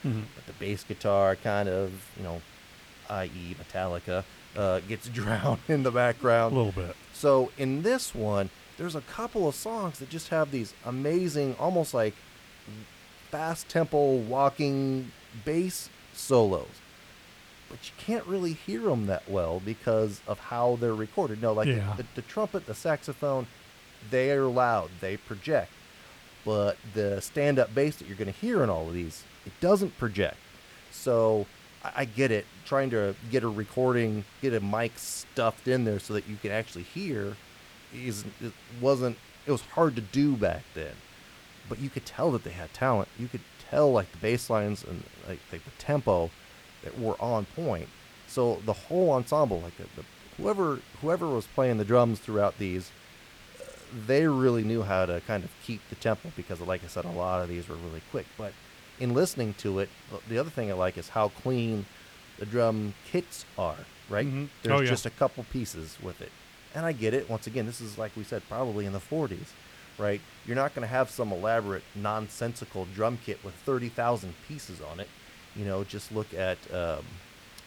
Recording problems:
hiss; faint; throughout; 20 dB below the speech

